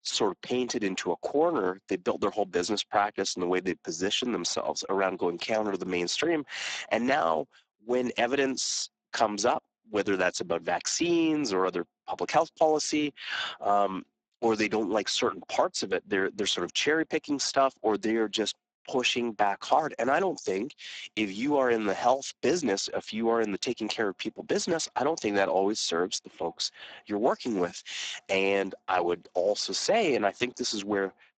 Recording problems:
garbled, watery; badly; nothing above 7.5 kHz
thin; somewhat; fading below 250 Hz

